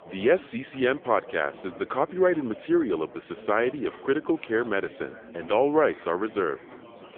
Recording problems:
phone-call audio; poor line
chatter from many people; noticeable; throughout; 20 dB below the speech

